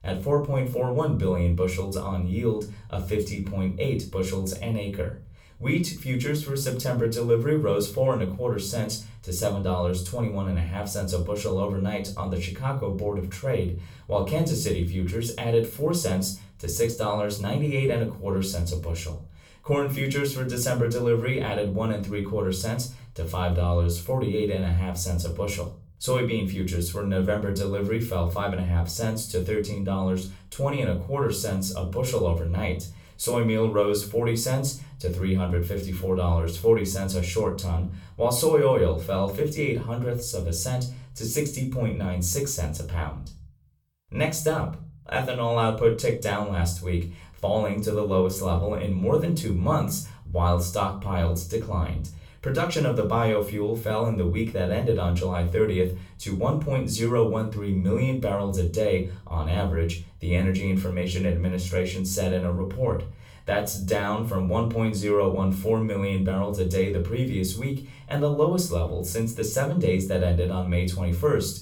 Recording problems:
off-mic speech; far
room echo; slight; dies away in 0.3 s

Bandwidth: 17.5 kHz